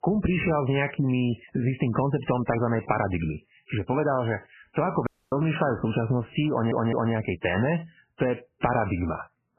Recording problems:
garbled, watery; badly; nothing above 3 kHz
squashed, flat; heavily
audio cutting out; at 5 s
audio stuttering; at 6.5 s

